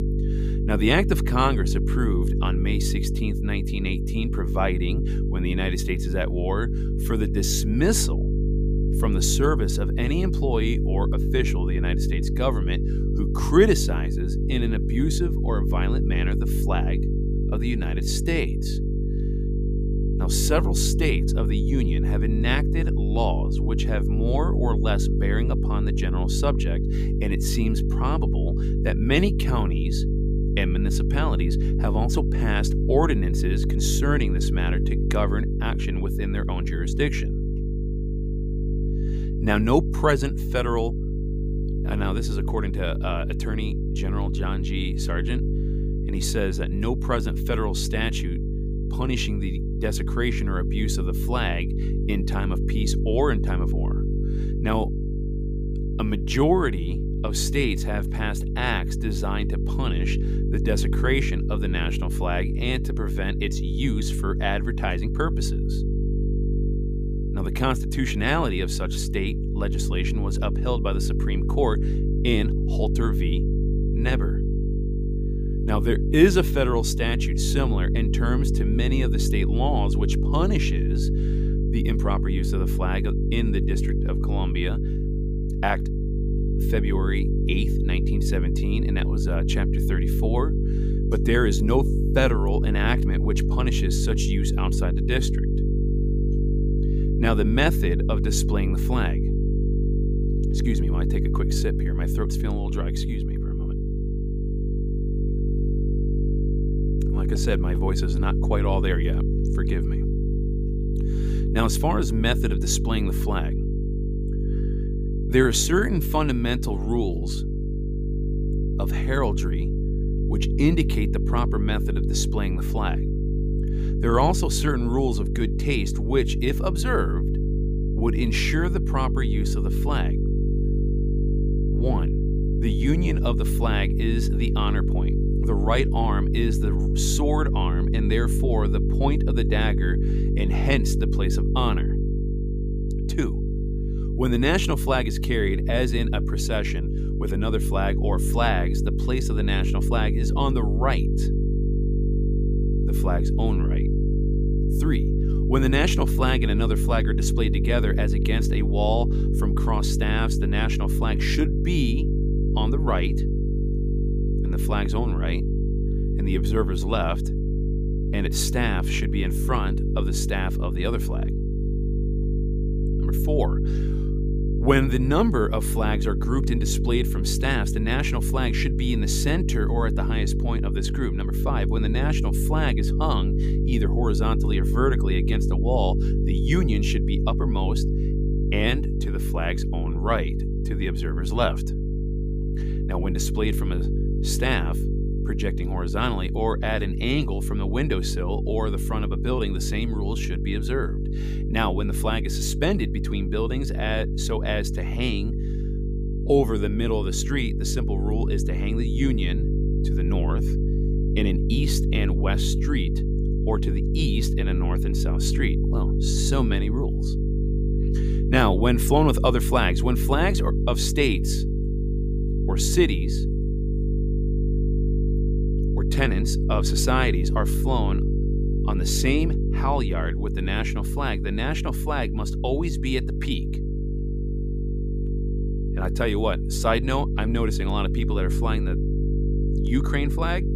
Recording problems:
electrical hum; loud; throughout; 50 Hz, 7 dB below the speech

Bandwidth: 15 kHz